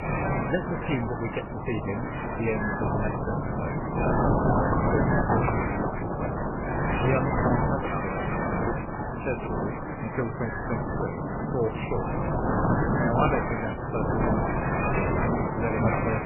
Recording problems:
garbled, watery; badly; nothing above 2.5 kHz
wind noise on the microphone; heavy; 4 dB above the speech

